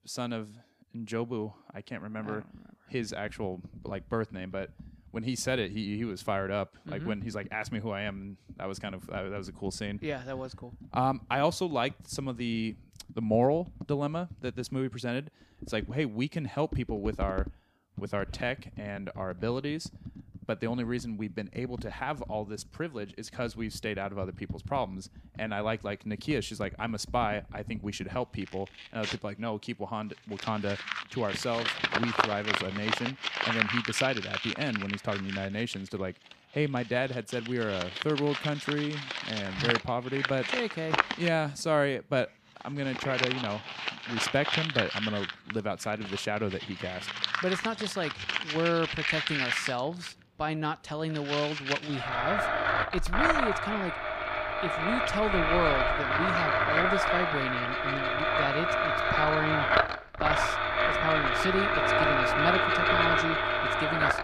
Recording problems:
household noises; very loud; throughout; 4 dB above the speech

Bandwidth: 15 kHz